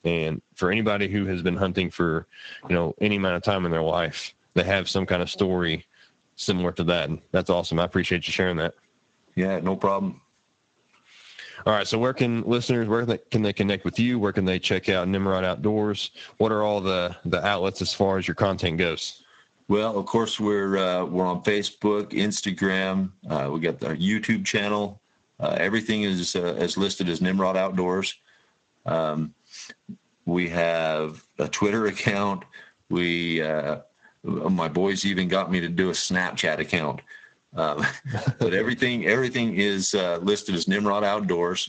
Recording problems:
garbled, watery; slightly; nothing above 7.5 kHz
squashed, flat; somewhat

